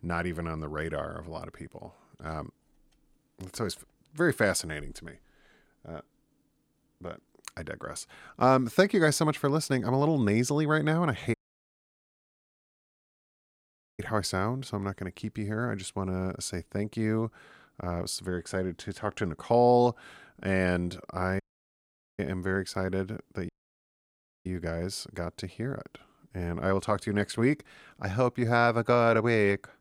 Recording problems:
audio cutting out; at 11 s for 2.5 s, at 21 s for 1 s and at 23 s for 1 s

